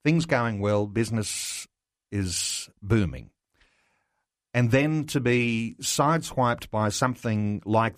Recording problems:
none

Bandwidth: 14.5 kHz